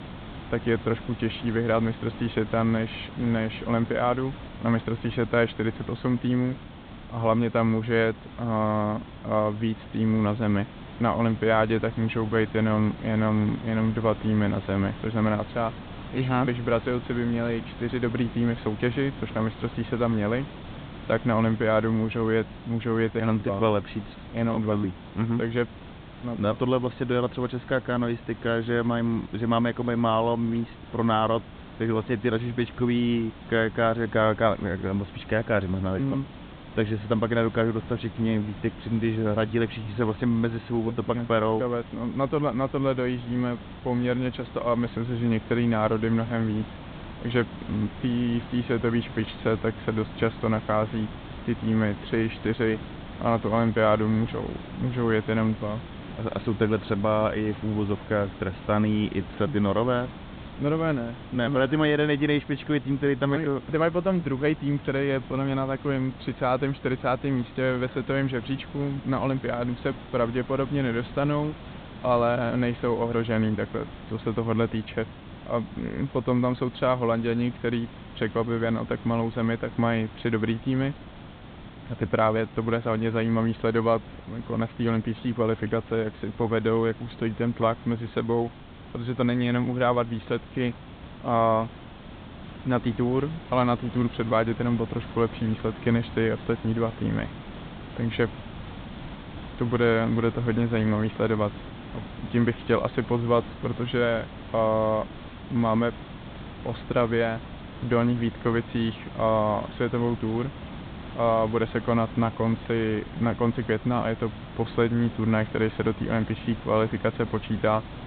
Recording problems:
high frequencies cut off; severe; nothing above 4 kHz
hiss; noticeable; throughout; 15 dB below the speech

